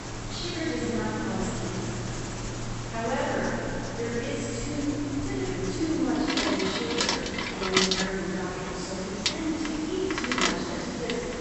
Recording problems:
room echo; strong; dies away in 3 s
off-mic speech; far
high frequencies cut off; noticeable; nothing above 8 kHz
household noises; loud; throughout; 1 dB below the speech
hiss; loud; throughout; 7 dB below the speech

